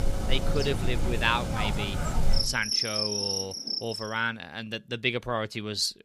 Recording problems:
animal sounds; very loud; until 3.5 s; 1 dB above the speech

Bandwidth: 15.5 kHz